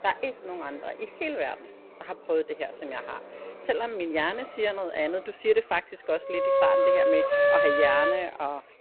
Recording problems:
phone-call audio; poor line; nothing above 4 kHz
muffled; very slightly; fading above 3 kHz
background music; very loud; from 6.5 s on; 7 dB above the speech
chatter from many people; noticeable; throughout; 20 dB below the speech
traffic noise; faint; throughout; 20 dB below the speech

